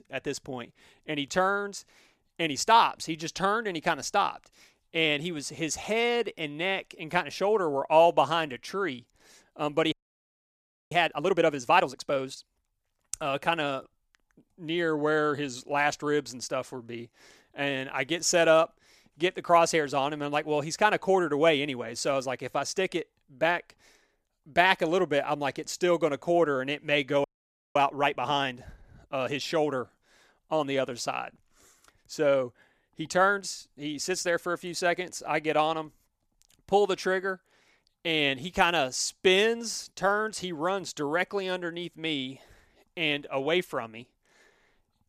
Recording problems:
audio freezing; at 10 s for 1 s and at 27 s for 0.5 s

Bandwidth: 14.5 kHz